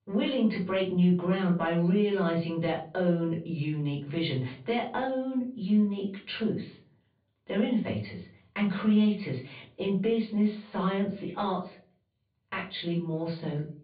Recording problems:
off-mic speech; far
high frequencies cut off; severe; nothing above 4.5 kHz
room echo; slight; dies away in 0.3 s

